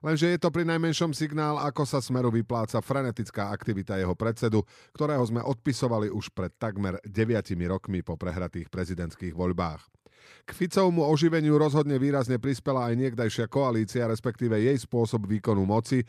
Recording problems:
none

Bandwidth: 14 kHz